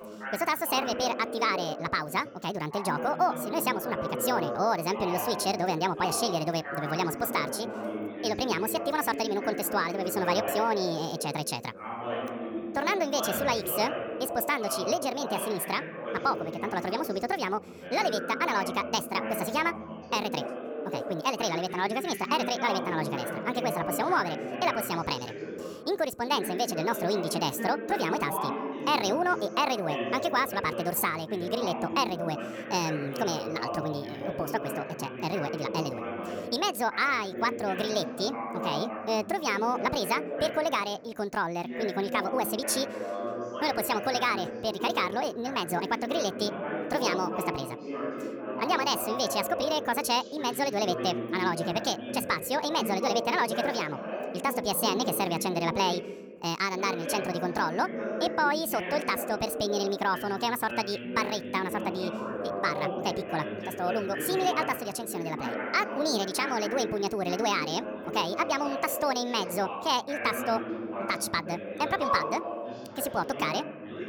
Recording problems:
wrong speed and pitch; too fast and too high; 1.5 times normal speed
background chatter; loud; throughout; 2 voices, 6 dB below the speech

